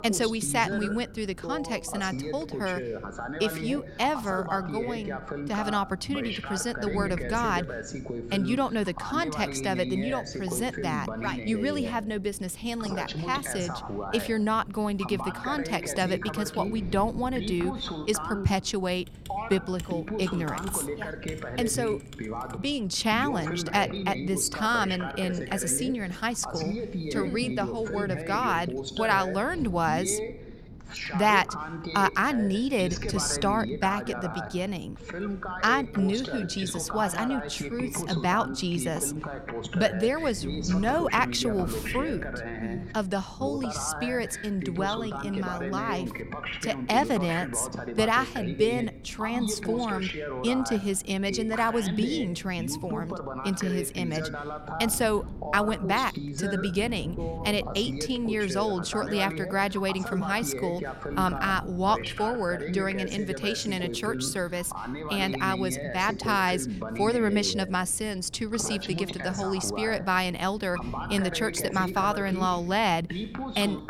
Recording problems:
voice in the background; loud; throughout; 7 dB below the speech
wind noise on the microphone; occasional gusts; 25 dB below the speech
keyboard typing; faint; from 19 to 23 s; peak 10 dB below the speech

